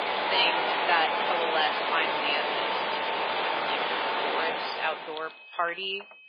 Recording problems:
garbled, watery; badly; nothing above 4.5 kHz
thin; very; fading below 550 Hz
machinery noise; very loud; until 5 s; 3 dB above the speech
high-pitched whine; noticeable; throughout; 2.5 kHz, 20 dB below the speech
household noises; noticeable; throughout; 20 dB below the speech

